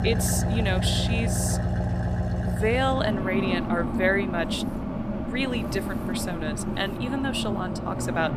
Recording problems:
traffic noise; very loud; throughout; as loud as the speech
machinery noise; faint; throughout; 30 dB below the speech

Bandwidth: 14.5 kHz